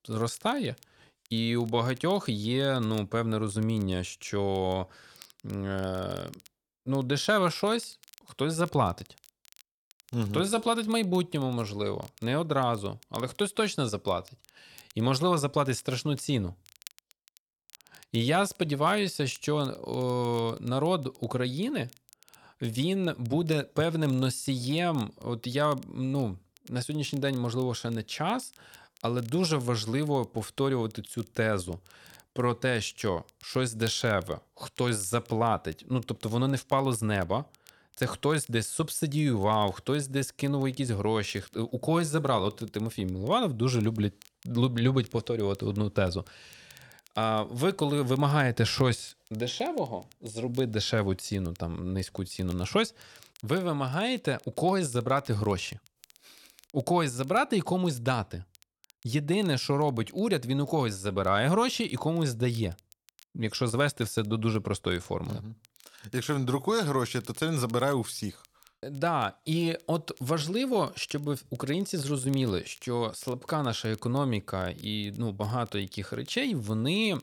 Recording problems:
crackle, like an old record; faint; 25 dB below the speech

